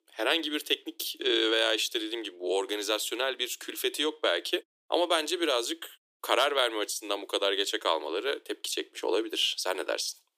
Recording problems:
thin; very; fading below 300 Hz

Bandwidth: 15 kHz